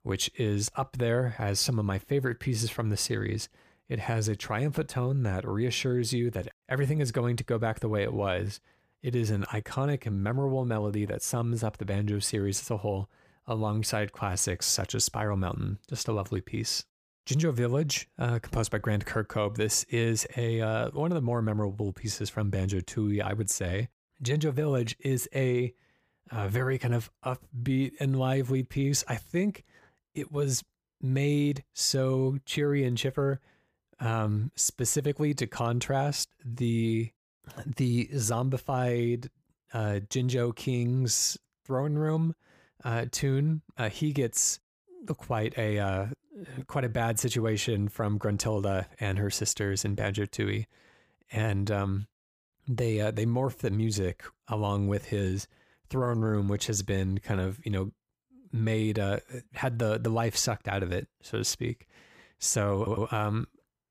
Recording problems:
audio stuttering; at 1:03

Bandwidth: 15 kHz